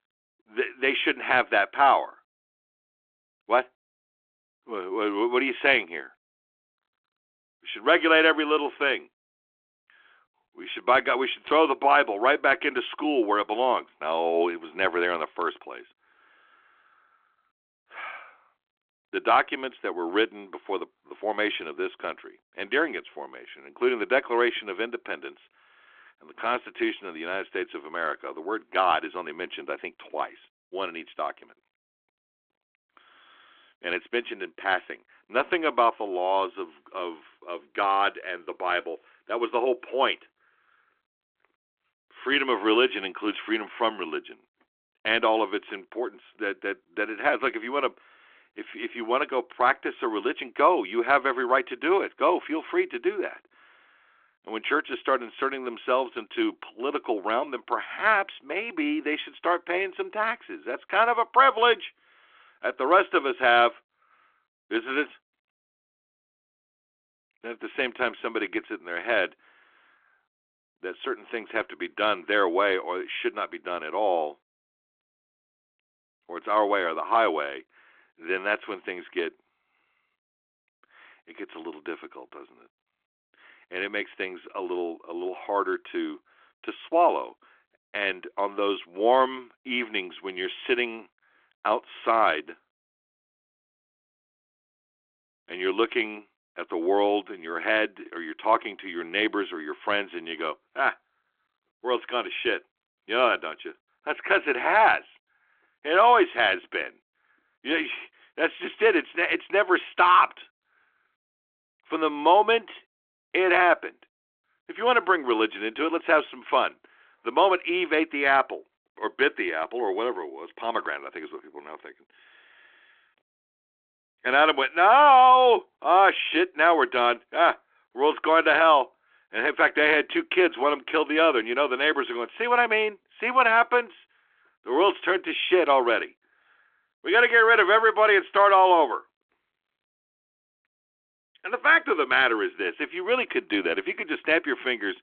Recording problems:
phone-call audio; nothing above 3.5 kHz

